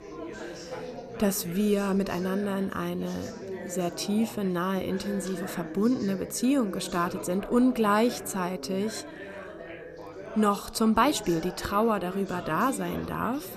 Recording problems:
background chatter; noticeable; throughout; 4 voices, 10 dB below the speech

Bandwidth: 14.5 kHz